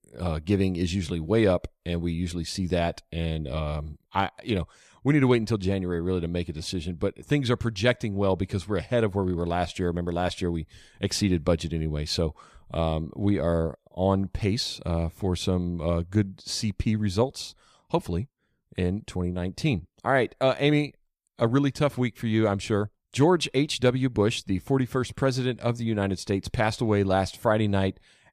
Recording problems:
none

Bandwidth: 14.5 kHz